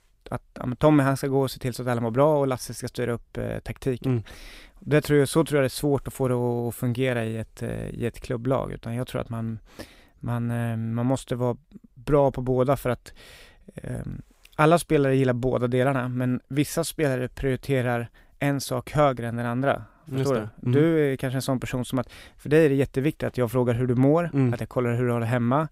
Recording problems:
none

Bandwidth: 15.5 kHz